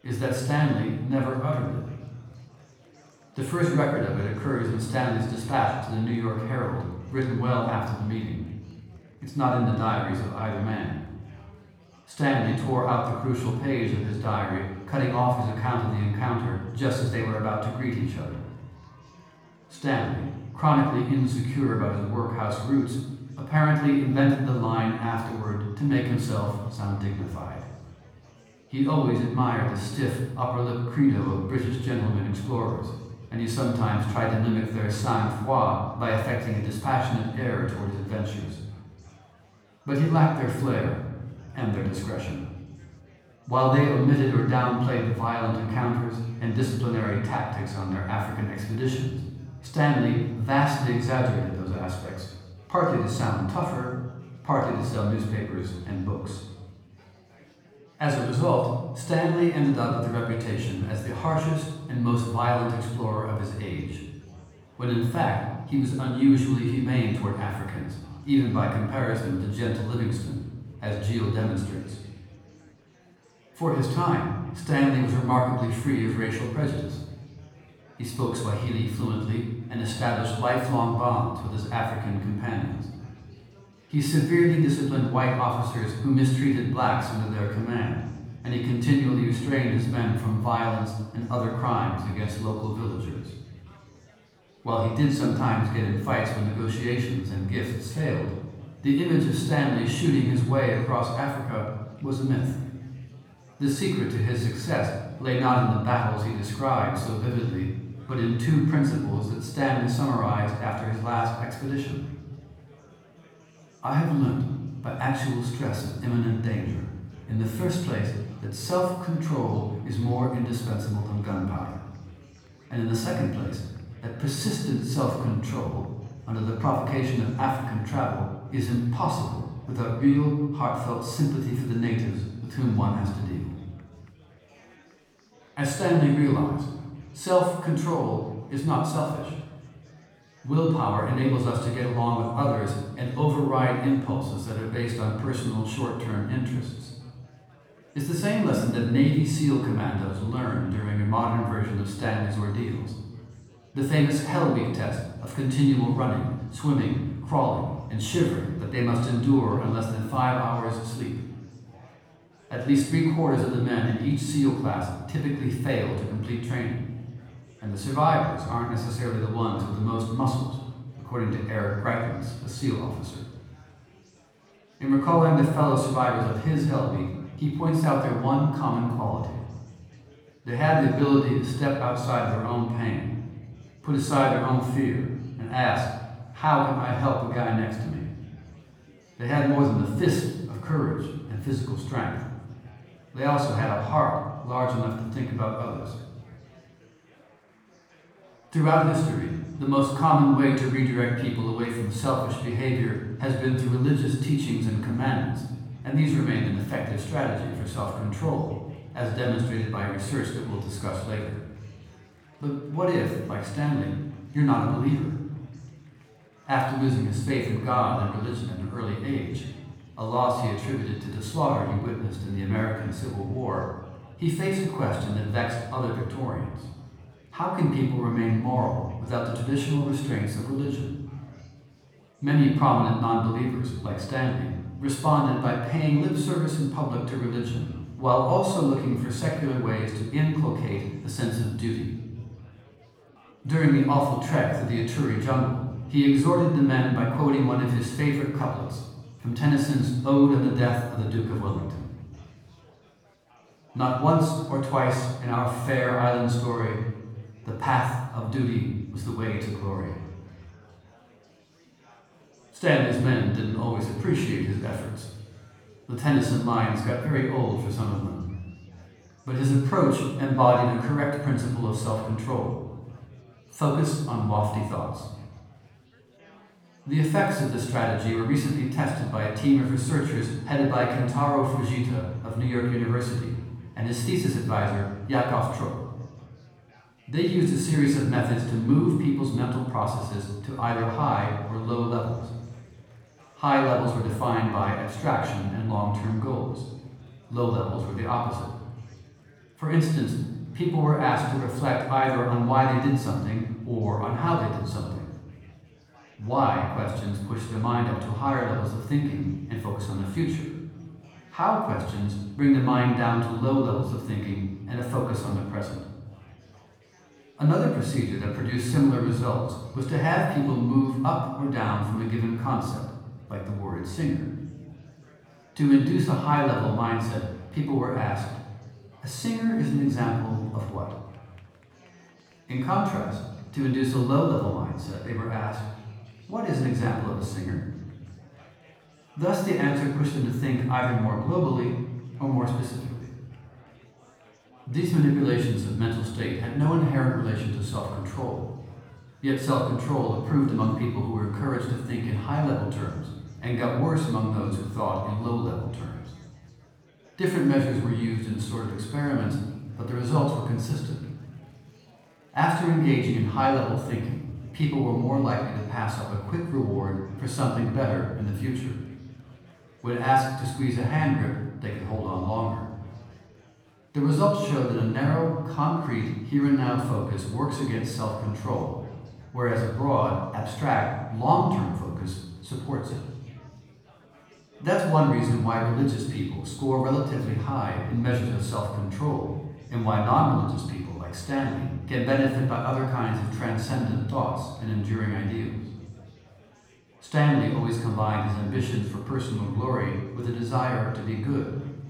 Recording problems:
off-mic speech; far
room echo; noticeable; dies away in 1 s
chatter from many people; faint; throughout; 30 dB below the speech

